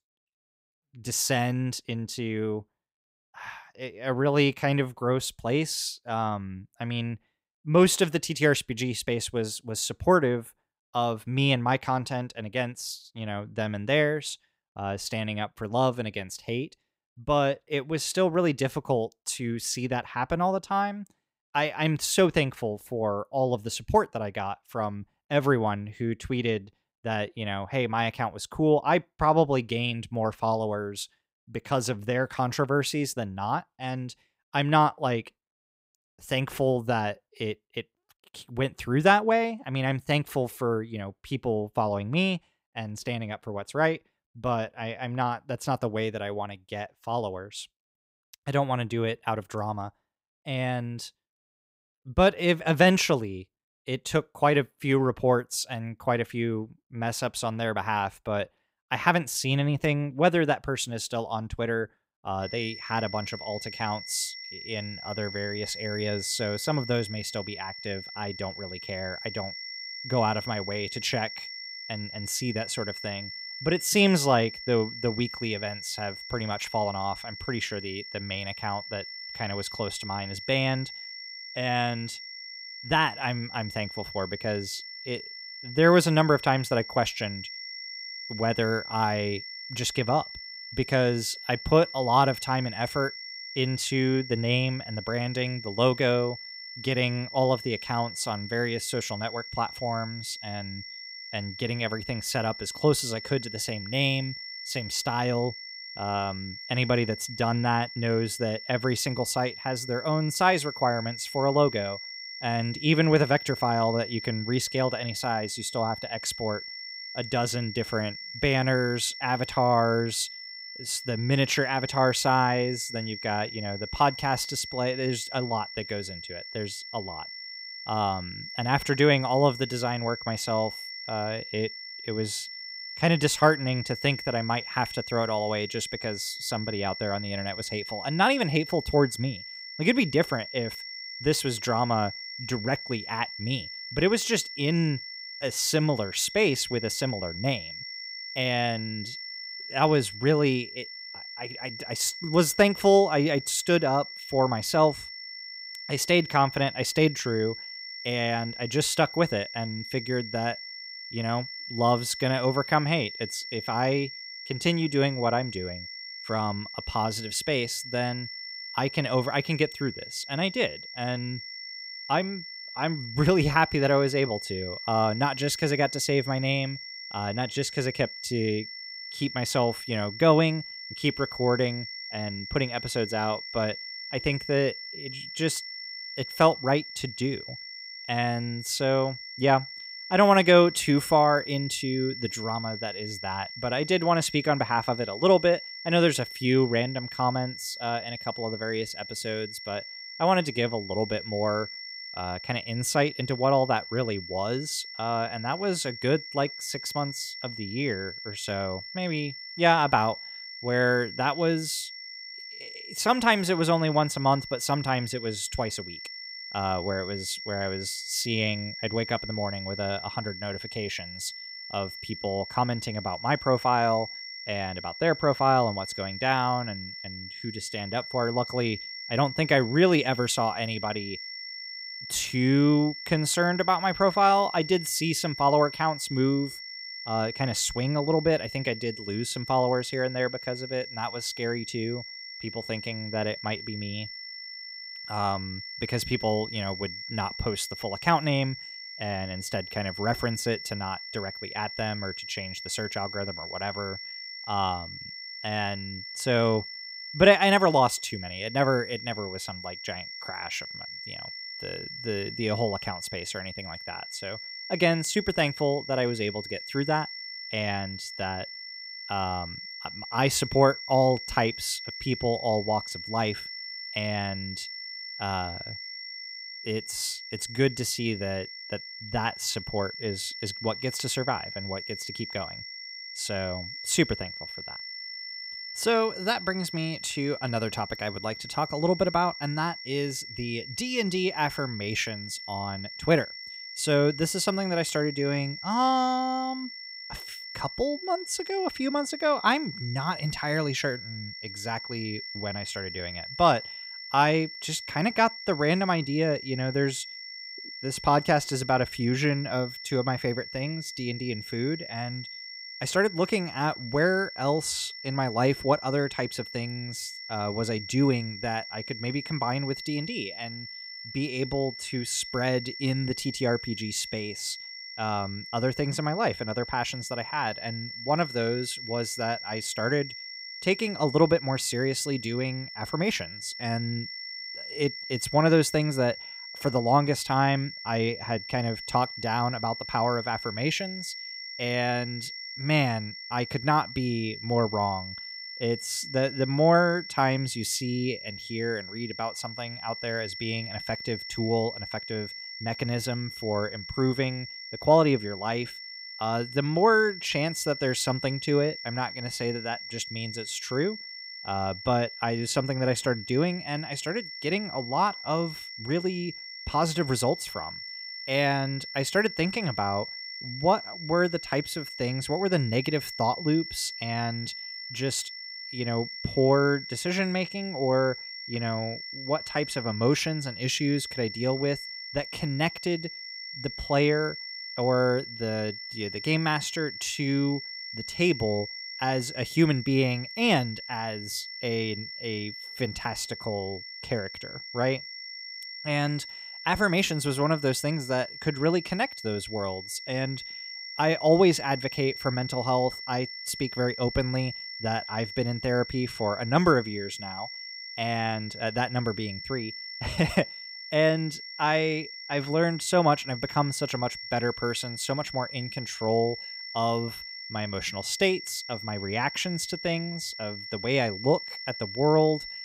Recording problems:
high-pitched whine; loud; from 1:02 on; 5.5 kHz, 9 dB below the speech

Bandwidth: 15.5 kHz